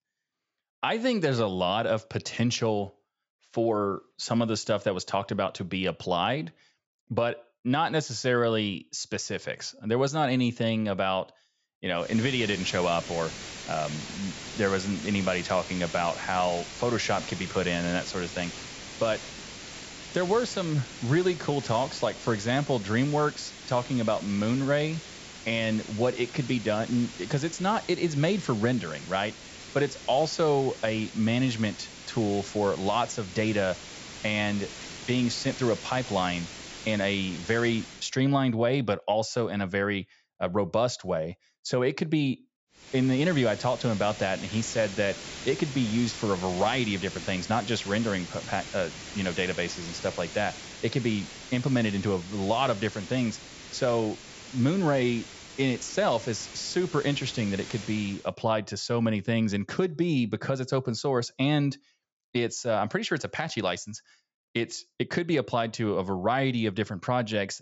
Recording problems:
high frequencies cut off; noticeable; nothing above 8 kHz
hiss; noticeable; from 12 to 38 s and from 43 to 58 s; 10 dB below the speech

